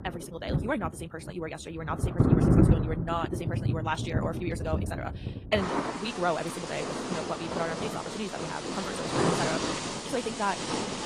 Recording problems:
wrong speed, natural pitch; too fast; 1.7 times normal speed
garbled, watery; slightly; nothing above 14 kHz
rain or running water; very loud; throughout; 4 dB above the speech

